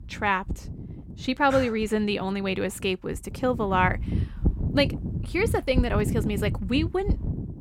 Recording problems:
wind noise on the microphone; occasional gusts; 15 dB below the speech

